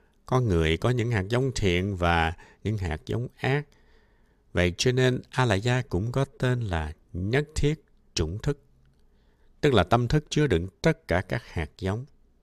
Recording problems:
none

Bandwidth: 14.5 kHz